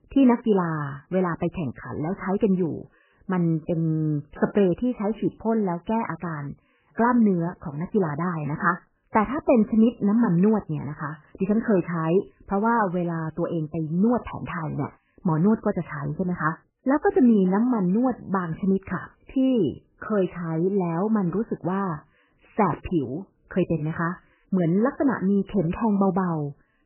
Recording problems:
garbled, watery; badly; nothing above 3 kHz

